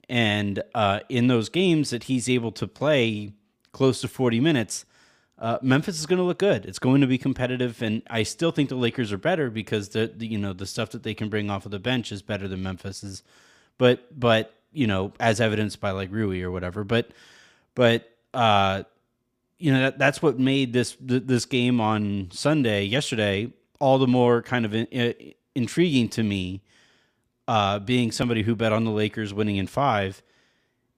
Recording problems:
none

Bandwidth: 15 kHz